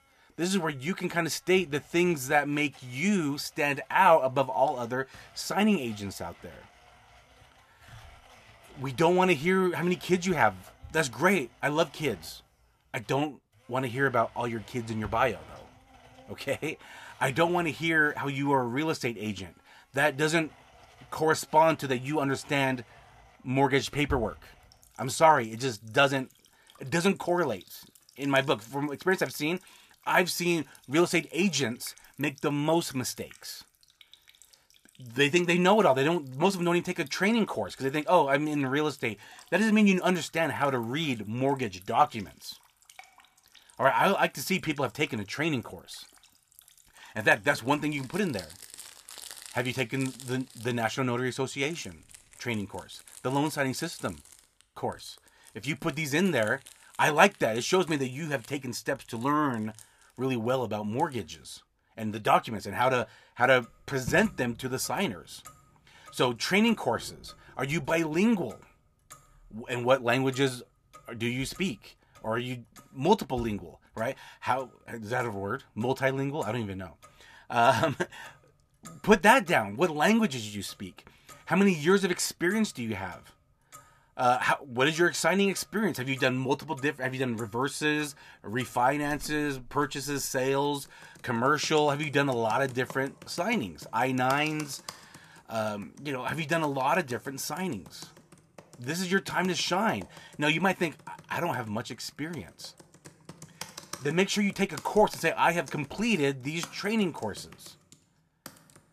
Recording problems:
household noises; faint; throughout; 25 dB below the speech

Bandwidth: 14.5 kHz